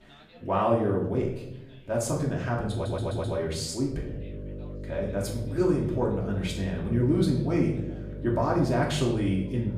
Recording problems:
off-mic speech; far
room echo; noticeable; dies away in 0.7 s
electrical hum; noticeable; from 4 s on; 50 Hz, 15 dB below the speech
background chatter; faint; throughout; 4 voices, 25 dB below the speech
audio stuttering; at 2.5 s

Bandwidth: 15 kHz